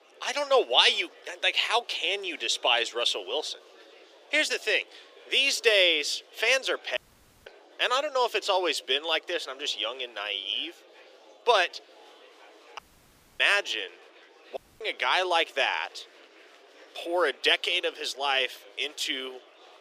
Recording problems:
thin; very; fading below 350 Hz
murmuring crowd; faint; throughout; 25 dB below the speech
audio cutting out; at 7 s, at 13 s for 0.5 s and at 15 s

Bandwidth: 15 kHz